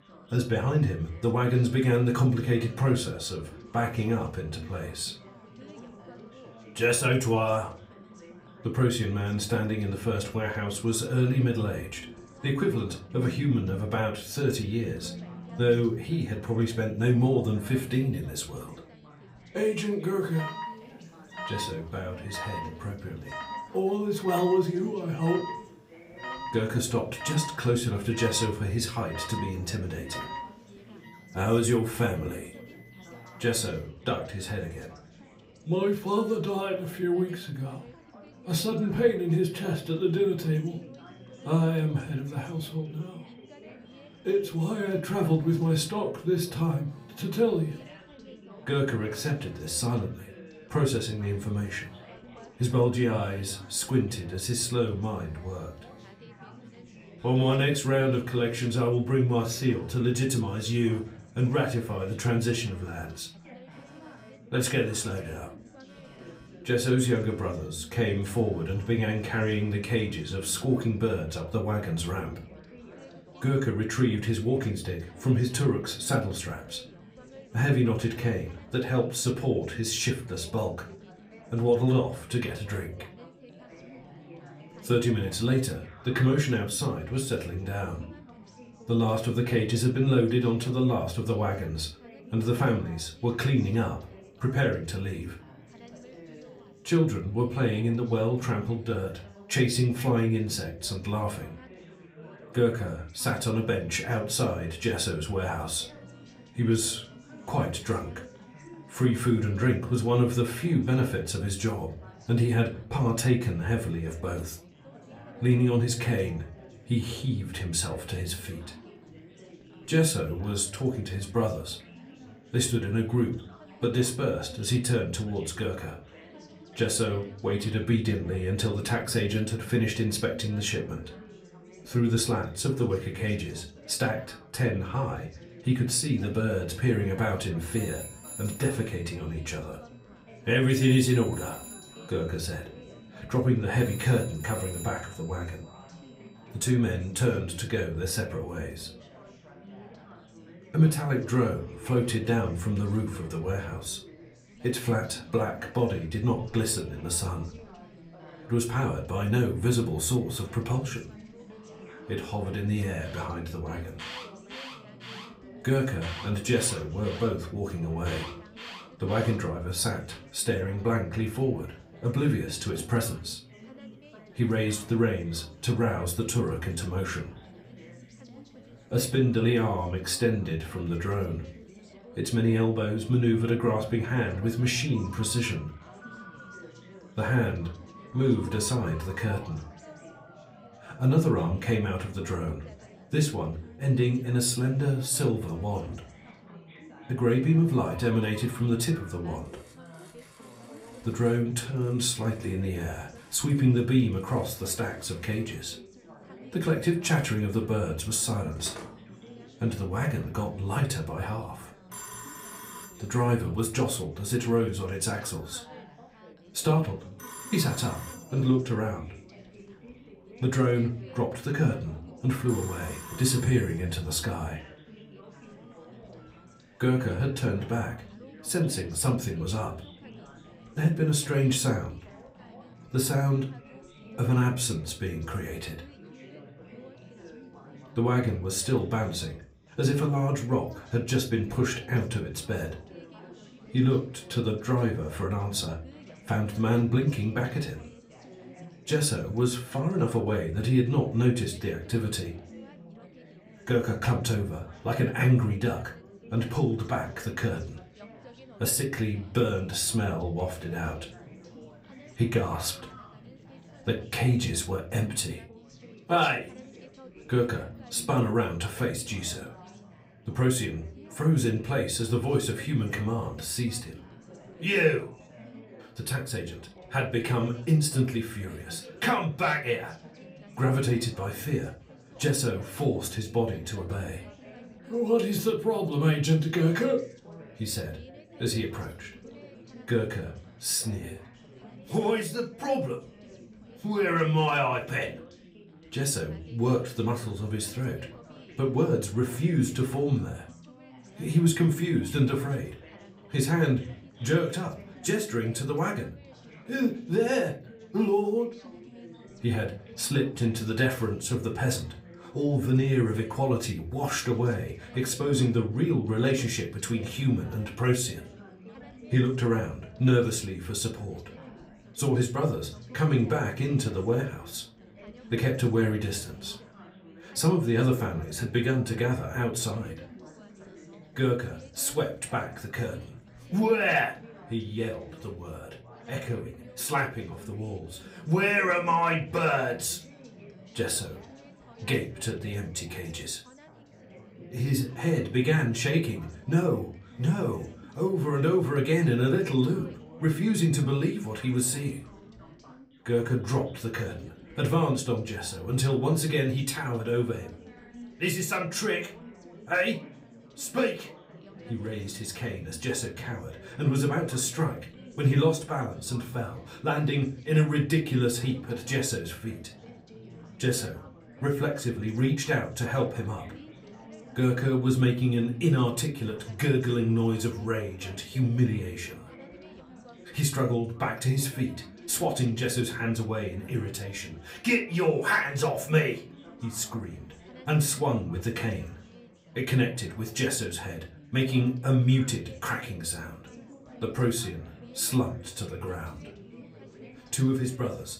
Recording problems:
off-mic speech; far
room echo; very slight; dies away in 0.3 s
alarms or sirens; noticeable; until 3:59; 20 dB below the speech
chatter from many people; faint; throughout; 20 dB below the speech

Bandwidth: 15.5 kHz